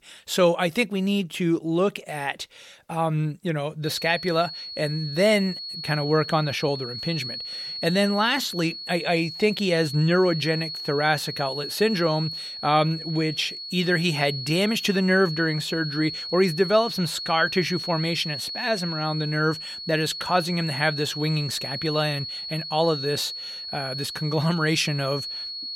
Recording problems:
high-pitched whine; loud; from 4 s on; 4.5 kHz, 7 dB below the speech

